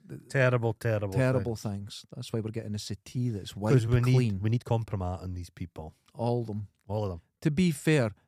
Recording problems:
uneven, jittery; strongly; from 2.5 to 7.5 s

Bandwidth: 14.5 kHz